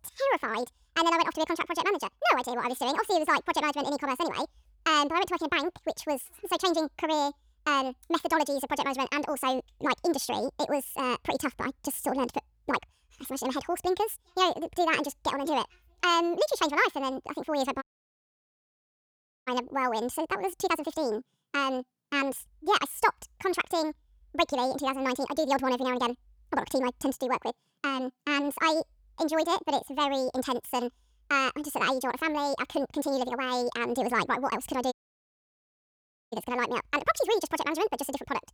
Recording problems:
wrong speed and pitch; too fast and too high; 1.7 times normal speed
audio cutting out; at 18 s for 1.5 s and at 35 s for 1.5 s

